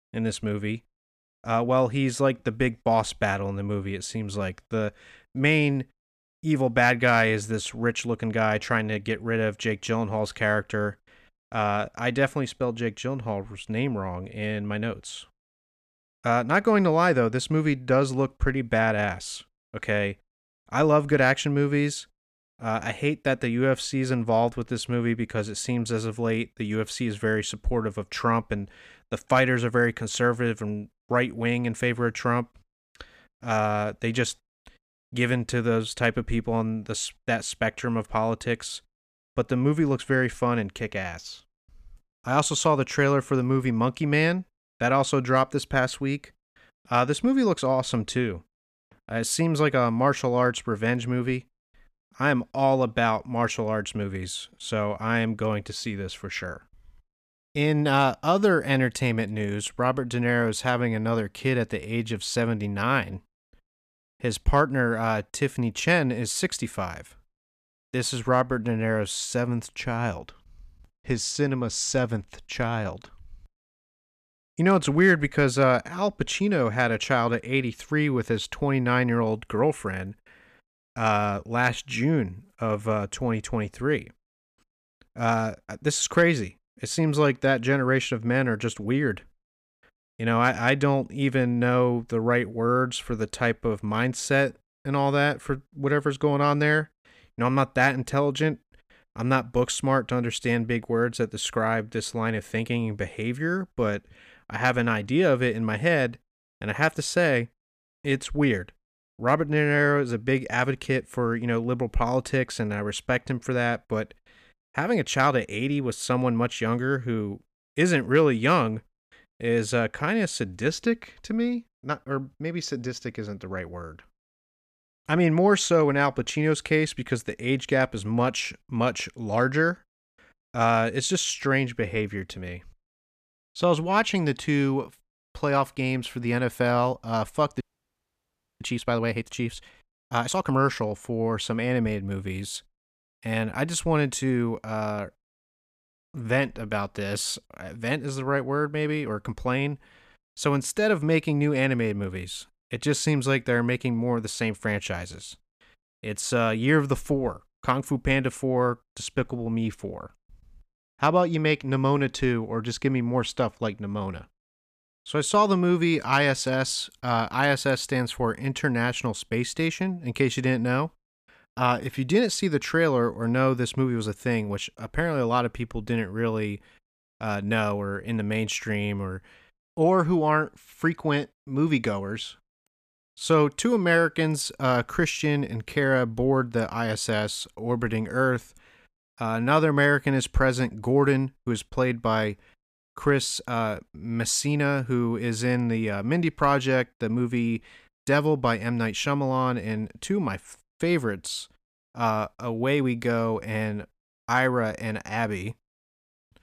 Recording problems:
audio freezing; at 2:18 for 1 s

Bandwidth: 14.5 kHz